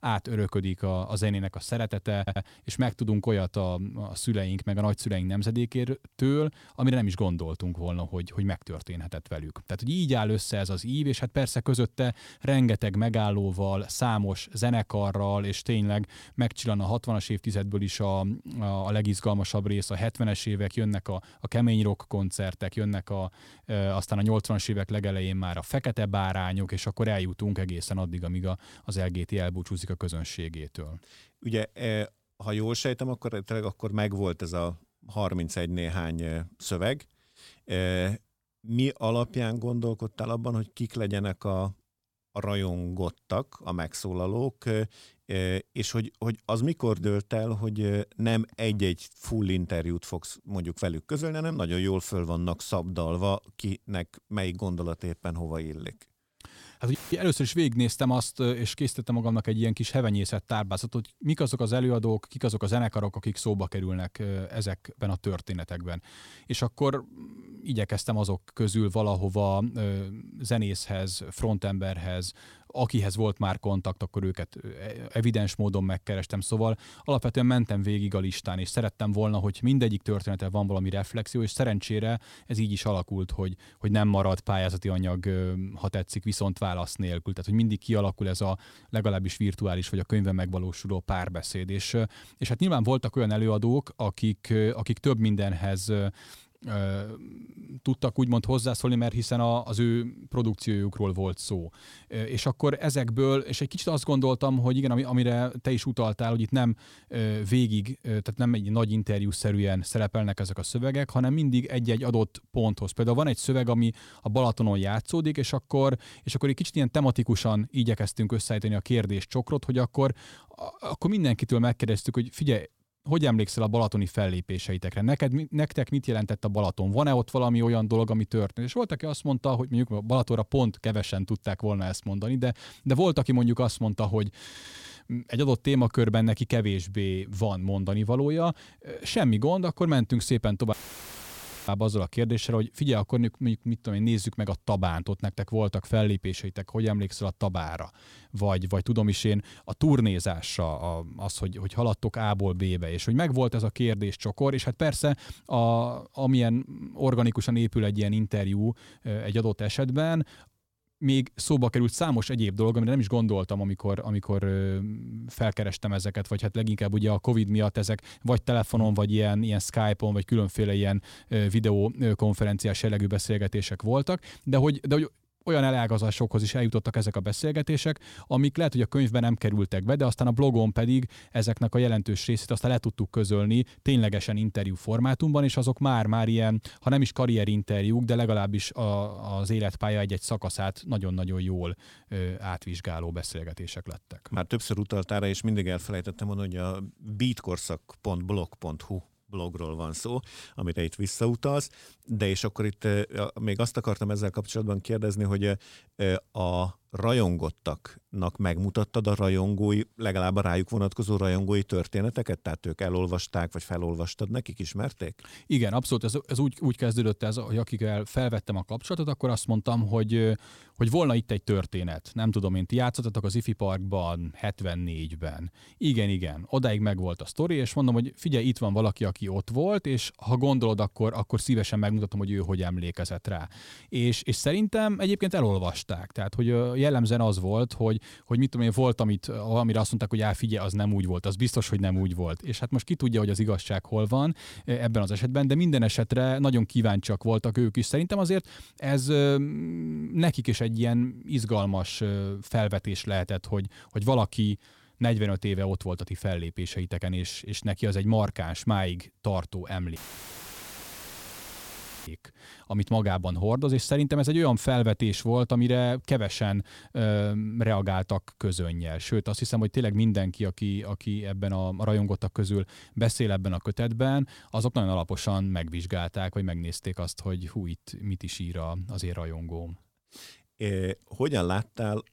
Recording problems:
audio stuttering; at 2 s and at 2:14
audio cutting out; filled with static; at 57 s, at 2:21 for 1 s and at 4:20 for 2 s

